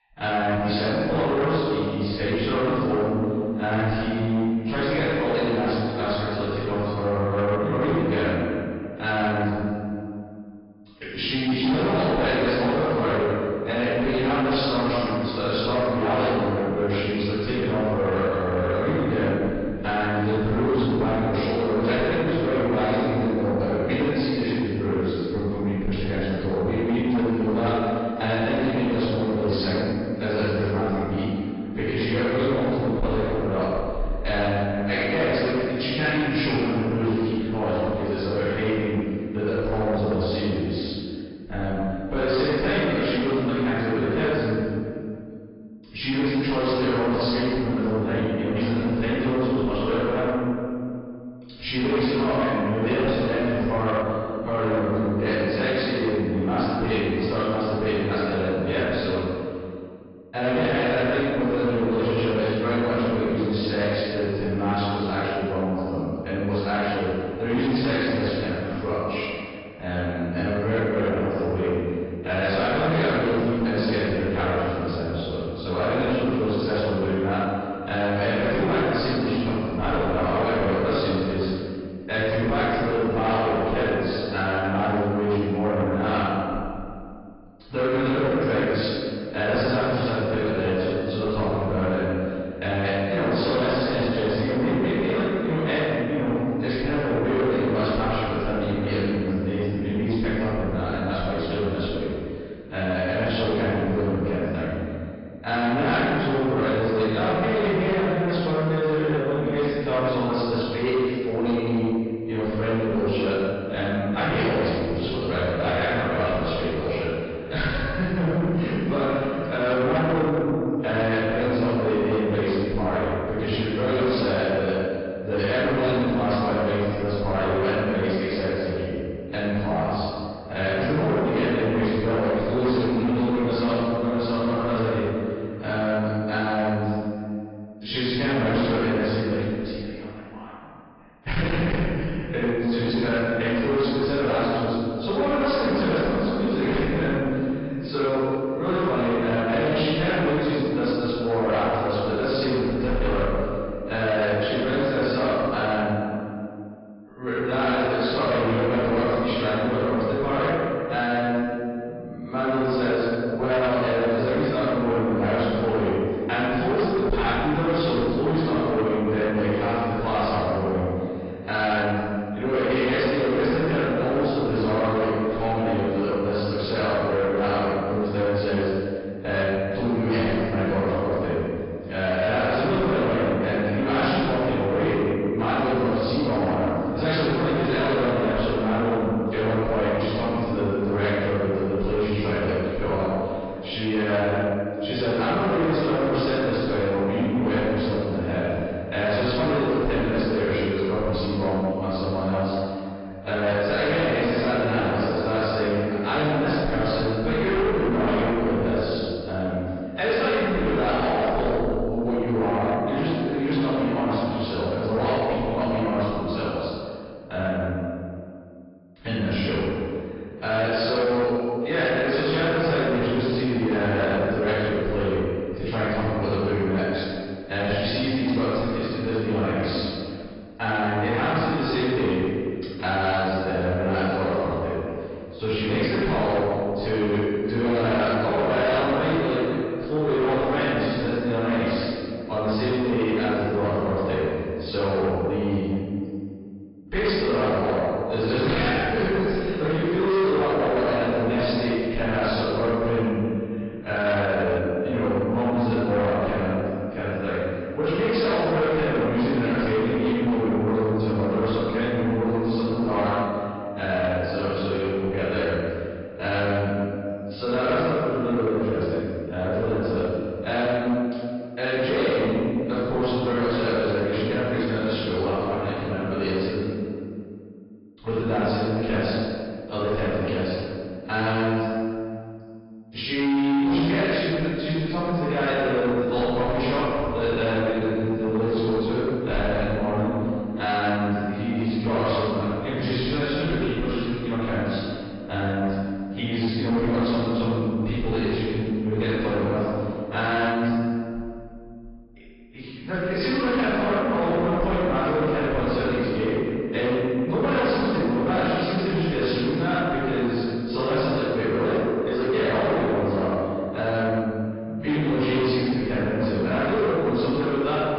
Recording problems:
room echo; strong; dies away in 2 s
off-mic speech; far
high frequencies cut off; noticeable; nothing above 5 kHz
distortion; slight; 10 dB below the speech
garbled, watery; slightly

